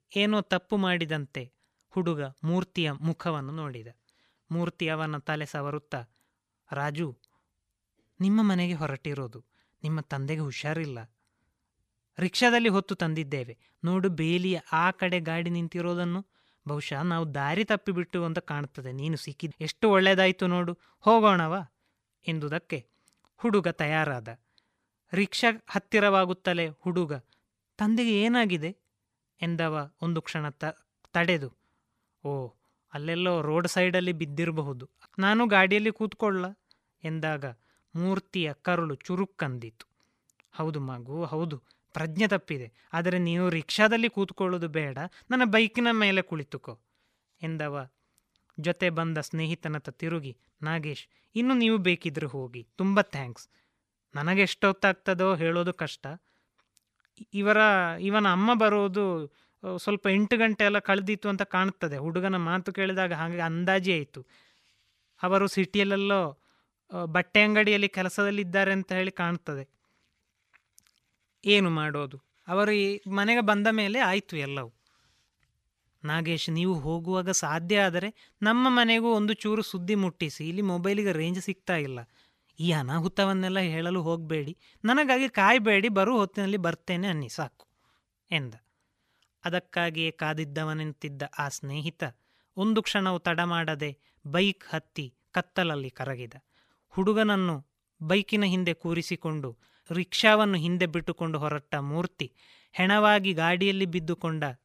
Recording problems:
none

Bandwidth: 15 kHz